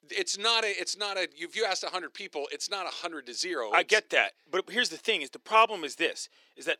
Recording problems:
thin; very; fading below 350 Hz

